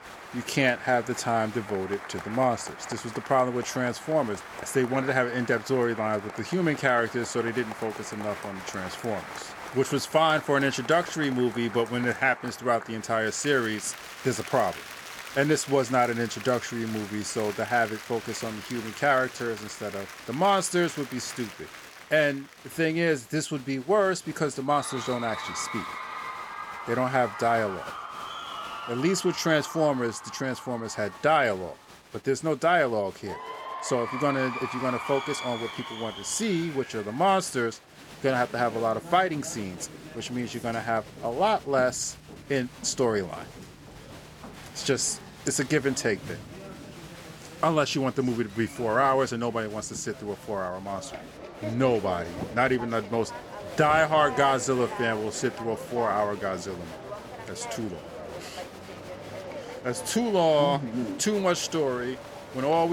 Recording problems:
crowd noise; noticeable; throughout; 10 dB below the speech
abrupt cut into speech; at the end

